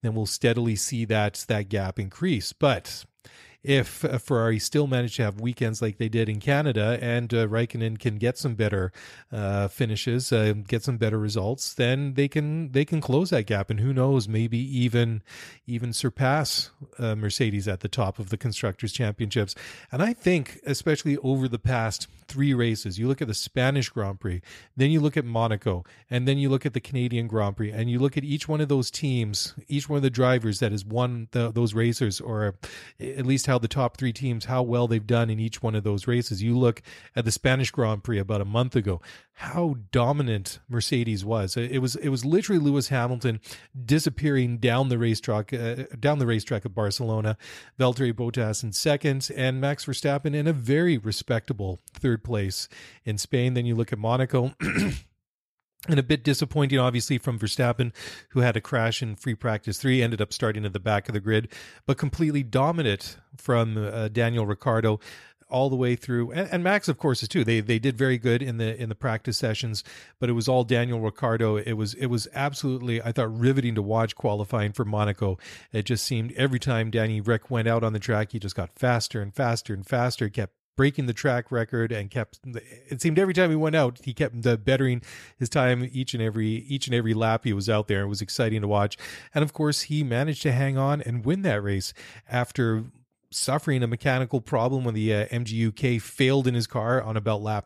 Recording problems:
none

